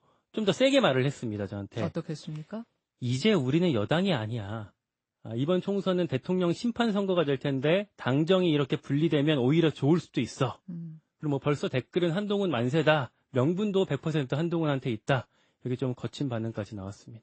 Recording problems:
garbled, watery; slightly; nothing above 8 kHz

